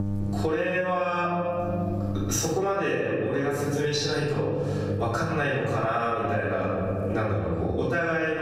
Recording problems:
room echo; strong; dies away in 1.3 s
off-mic speech; far
echo of what is said; faint; throughout; 210 ms later, 25 dB below the speech
squashed, flat; somewhat
electrical hum; noticeable; throughout; 50 Hz, 20 dB below the speech
abrupt cut into speech; at the end

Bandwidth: 15.5 kHz